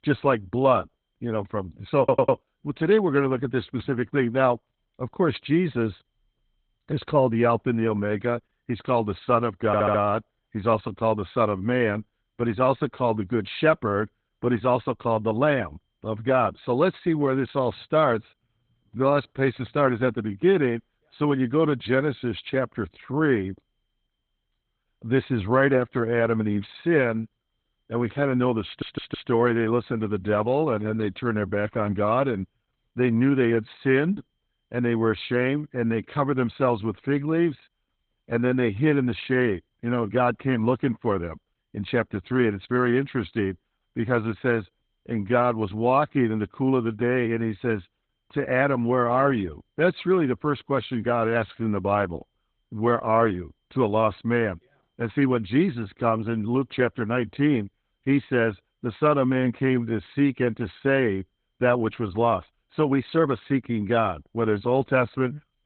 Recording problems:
garbled, watery; badly; nothing above 4 kHz
muffled; very slightly; fading above 4 kHz
high-pitched whine; very faint; throughout; 3 kHz, 55 dB below the speech
audio stuttering; at 2 s, at 9.5 s and at 29 s

